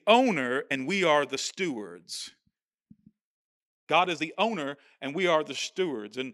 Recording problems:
uneven, jittery; strongly; from 0.5 to 6 s

